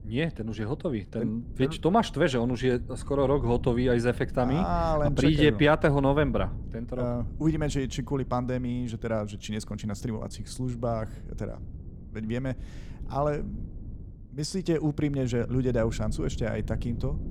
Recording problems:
low rumble; faint; throughout; 20 dB below the speech

